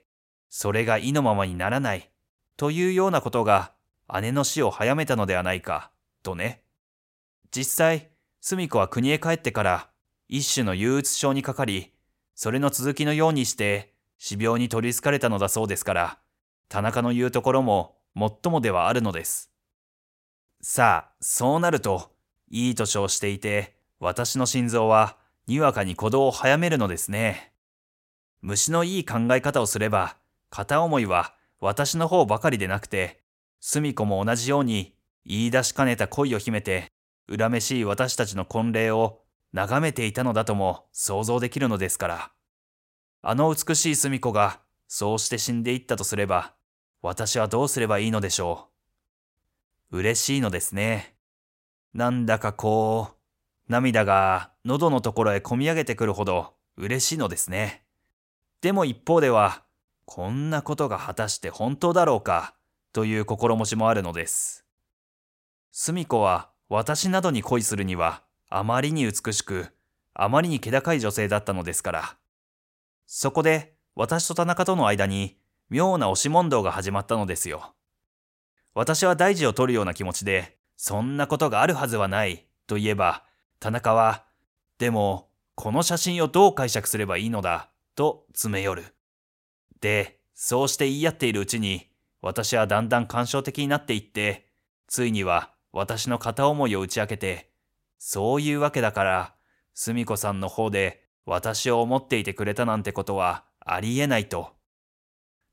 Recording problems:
none

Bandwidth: 16 kHz